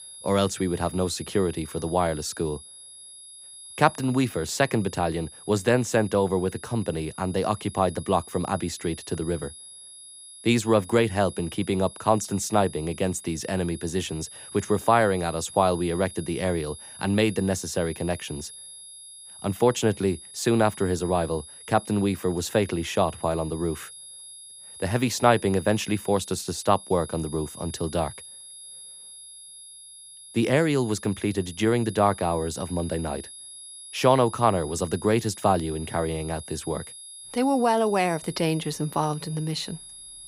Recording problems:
high-pitched whine; noticeable; throughout; 10.5 kHz, 15 dB below the speech

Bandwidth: 15.5 kHz